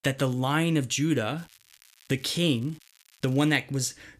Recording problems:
crackling; faint; from 1.5 to 3.5 s; 30 dB below the speech

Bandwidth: 14.5 kHz